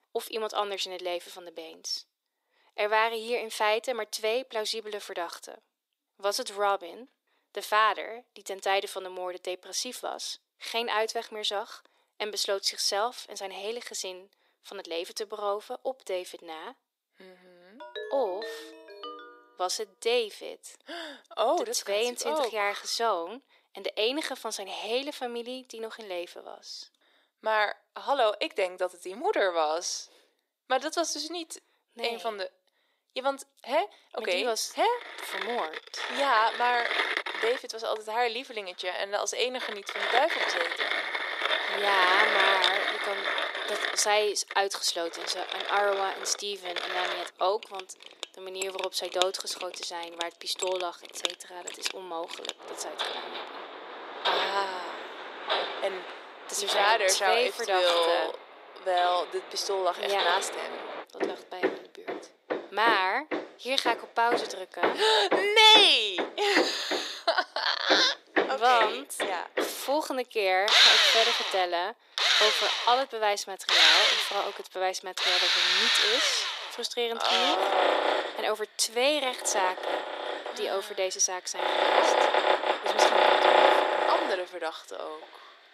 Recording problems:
thin; very; fading below 400 Hz
machinery noise; very loud; from 35 s on; 2 dB above the speech
phone ringing; noticeable; from 18 to 19 s; peak 10 dB below the speech

